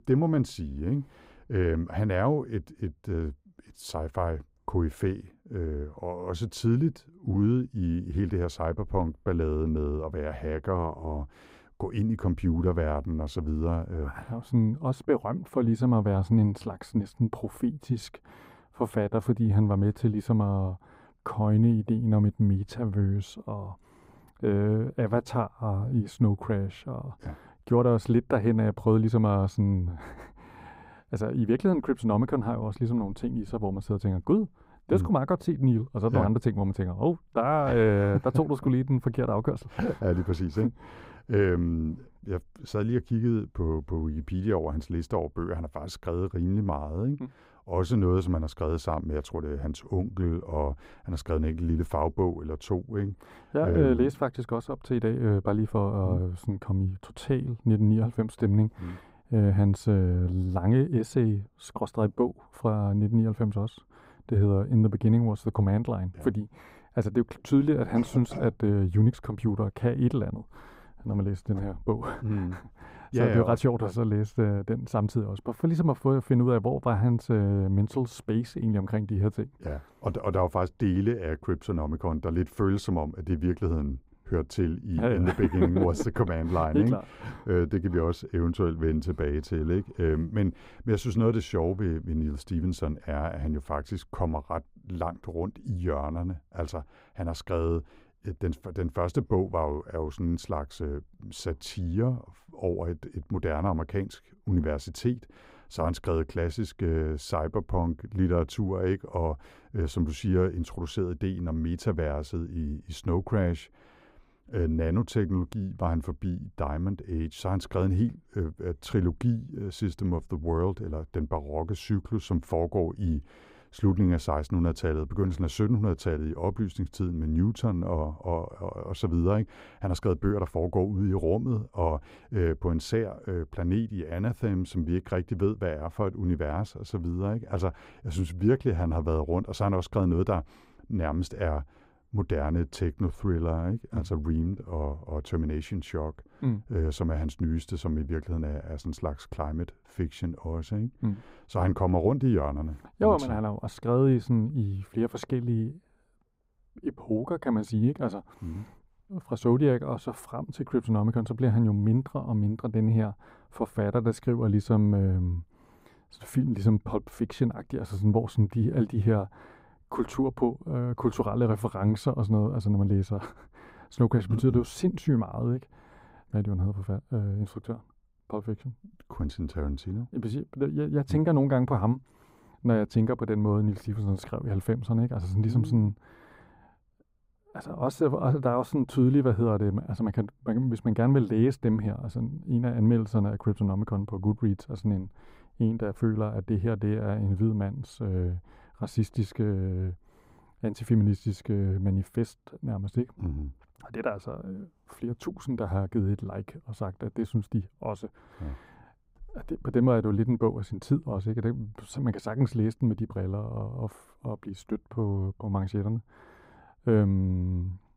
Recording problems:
muffled; slightly; fading above 2 kHz

